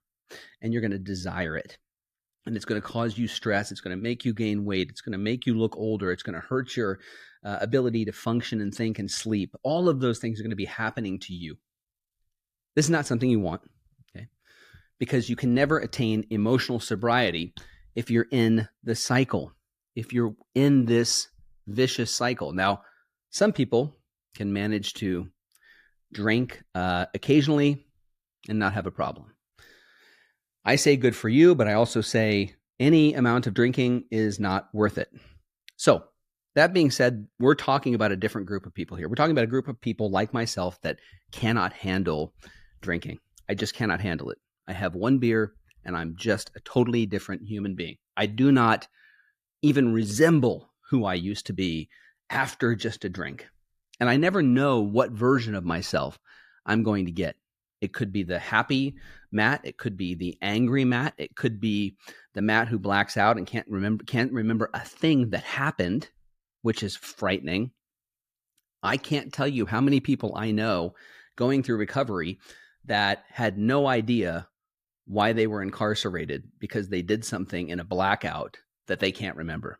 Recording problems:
none

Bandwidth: 14.5 kHz